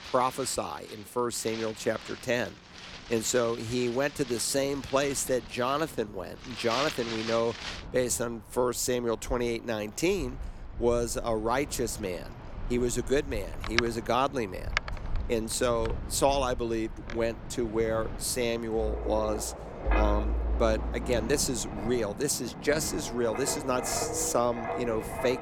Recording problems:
wind in the background; loud; throughout; 8 dB below the speech

